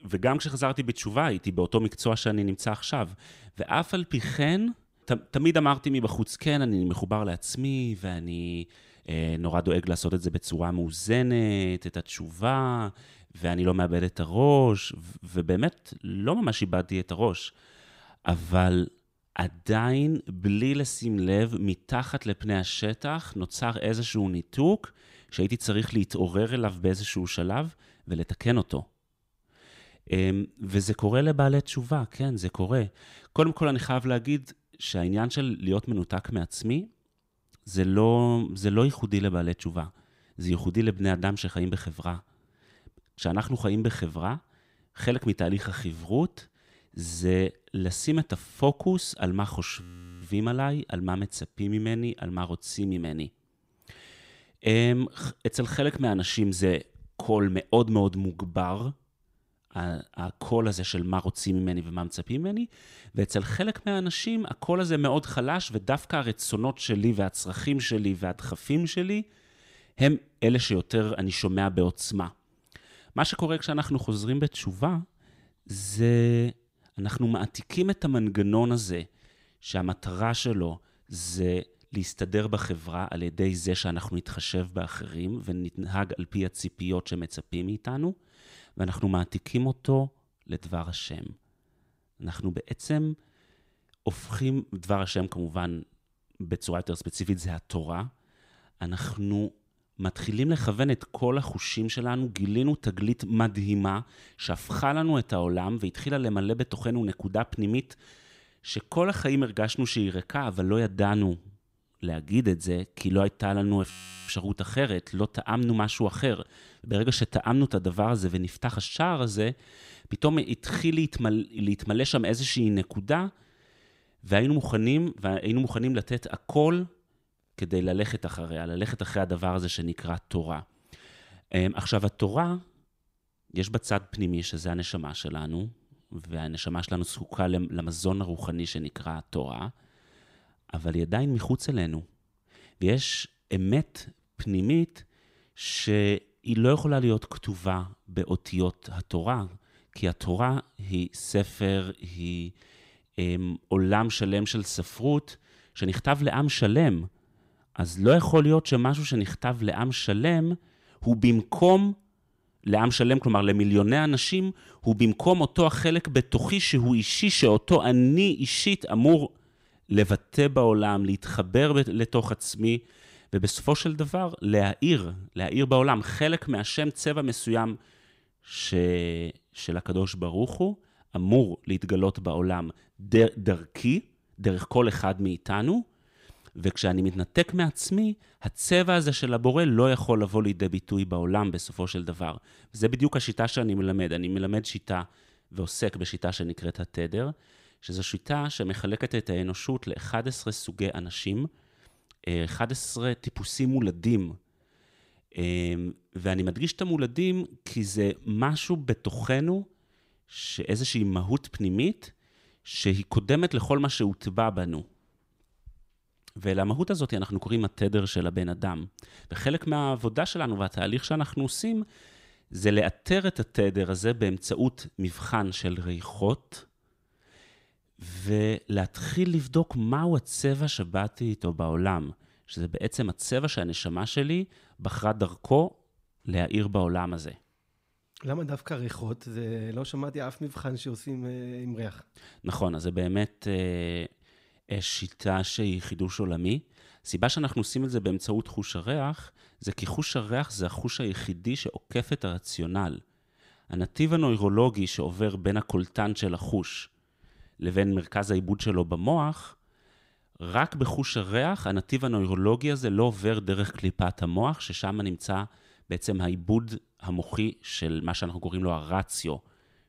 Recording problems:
audio freezing; at 50 s and at 1:54

